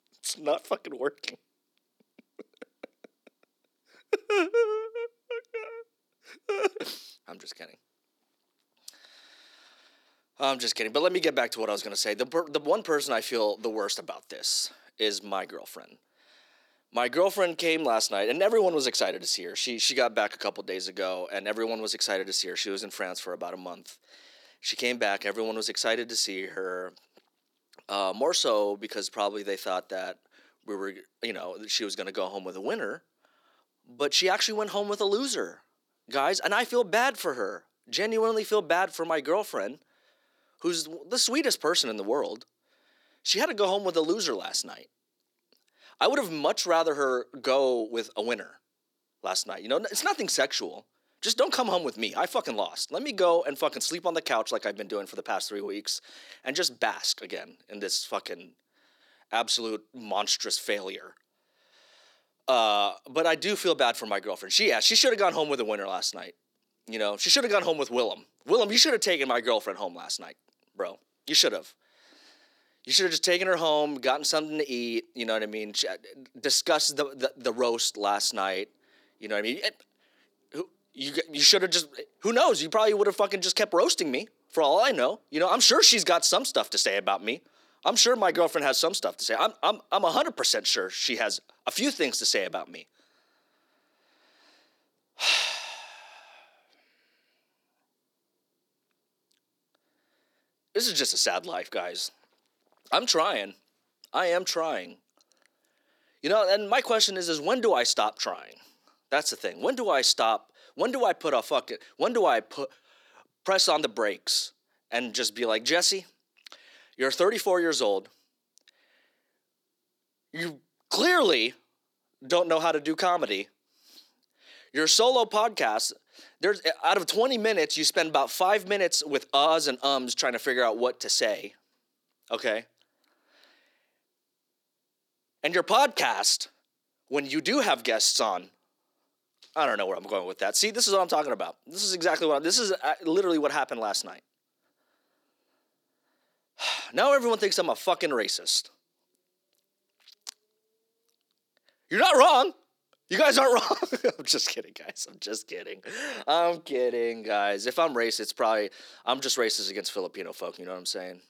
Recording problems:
thin; somewhat; fading below 300 Hz

